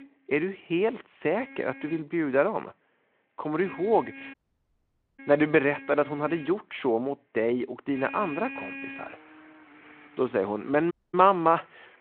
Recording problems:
phone-call audio
traffic noise; noticeable; throughout; 15 dB below the speech
audio cutting out; at 4.5 s for 1 s and at 11 s

